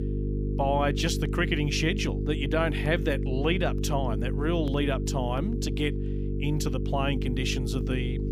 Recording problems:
electrical hum; loud; throughout; 50 Hz, 8 dB below the speech

